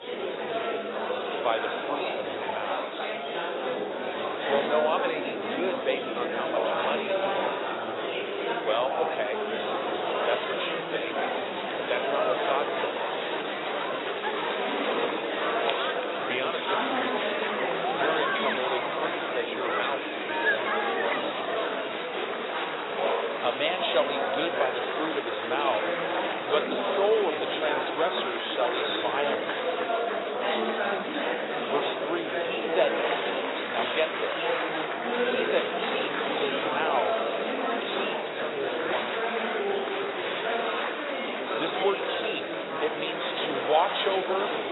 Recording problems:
garbled, watery; badly; nothing above 4 kHz
thin; very; fading below 500 Hz
murmuring crowd; very loud; throughout; 3 dB above the speech

